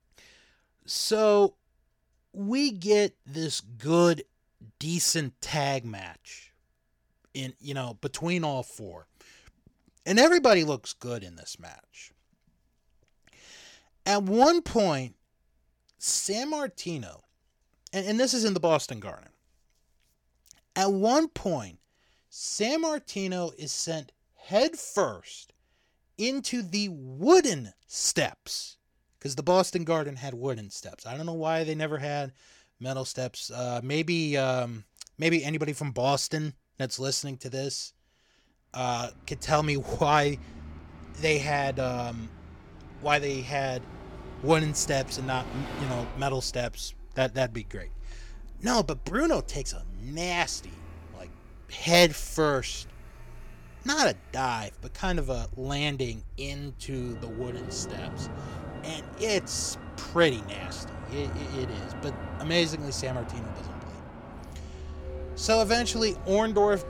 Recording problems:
traffic noise; noticeable; from 39 s on; 15 dB below the speech

